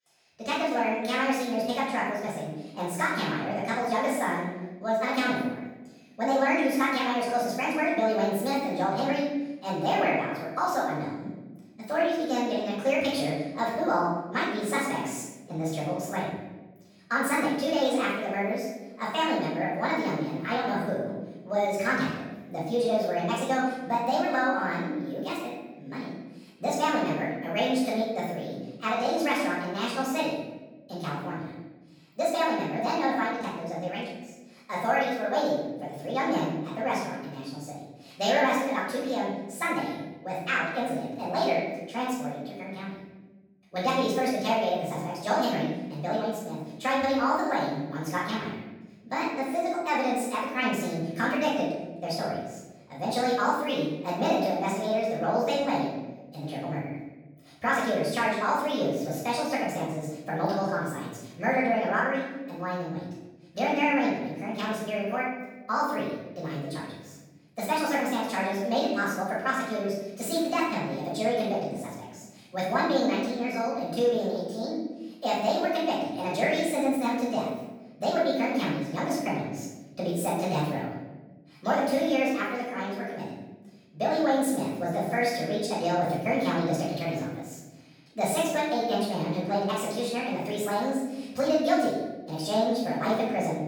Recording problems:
off-mic speech; far
wrong speed and pitch; too fast and too high; 1.6 times normal speed
room echo; noticeable; dies away in 1.1 s

